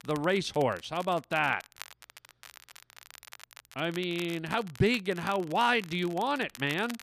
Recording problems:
crackle, like an old record; noticeable; 20 dB below the speech

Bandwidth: 14.5 kHz